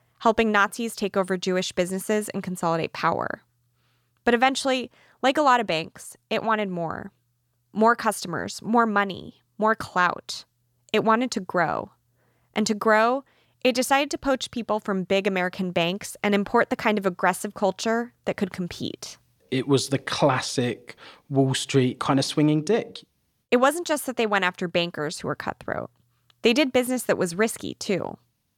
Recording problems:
none

